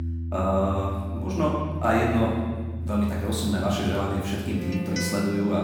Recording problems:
off-mic speech; far
room echo; noticeable; dies away in 1.4 s
background music; loud; throughout; 7 dB below the speech

